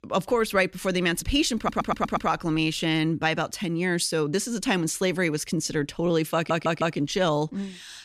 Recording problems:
audio stuttering; at 1.5 s and at 6.5 s

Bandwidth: 14.5 kHz